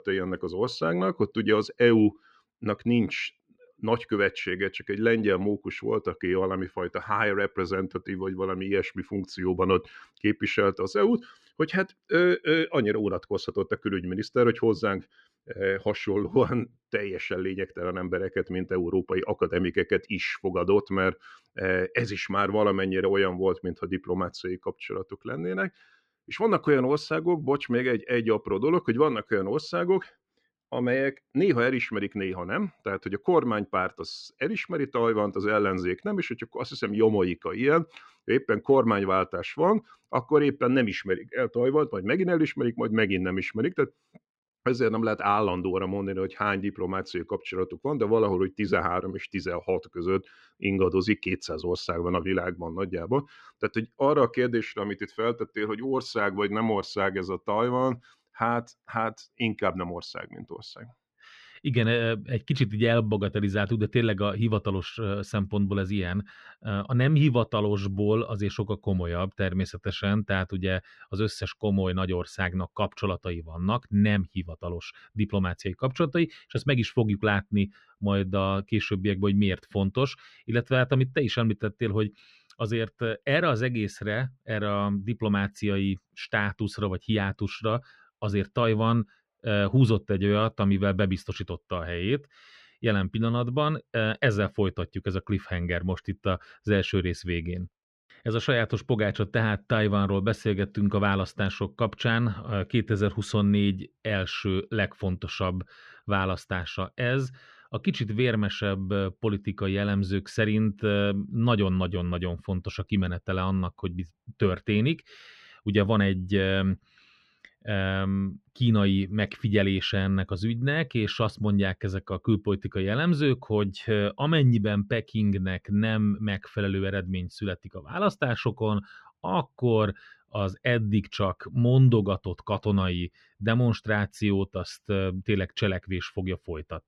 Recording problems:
muffled; slightly; fading above 2.5 kHz

